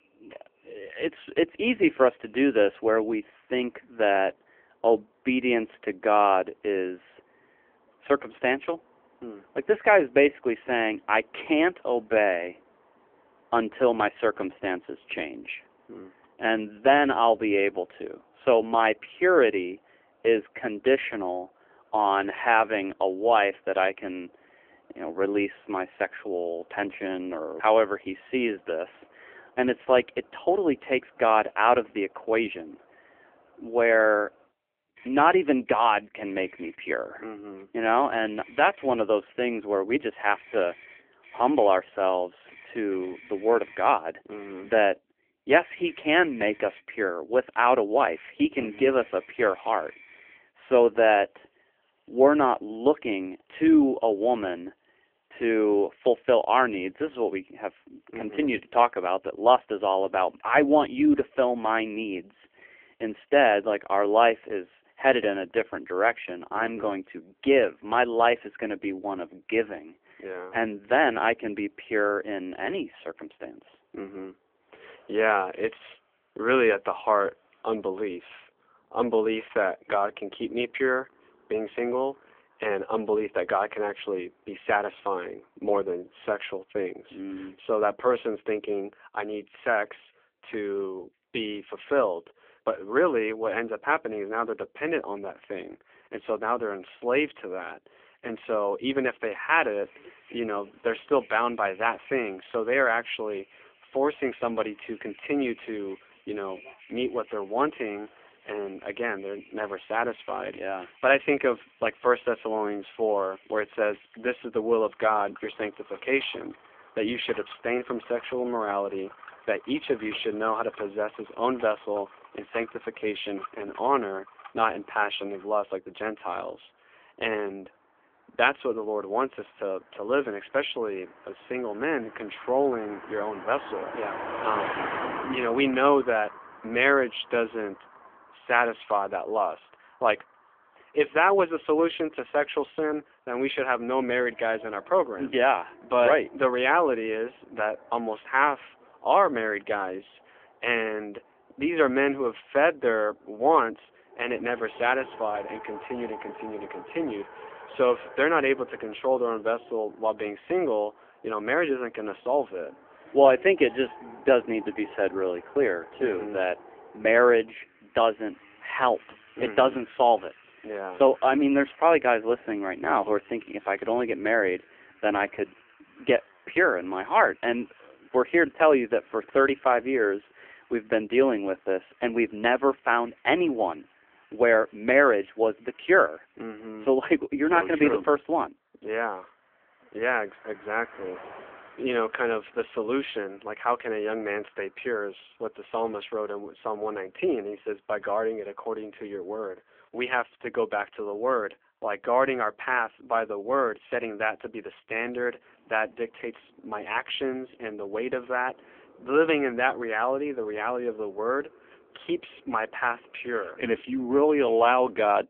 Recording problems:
phone-call audio; poor line; nothing above 3.5 kHz
traffic noise; faint; throughout; 20 dB below the speech

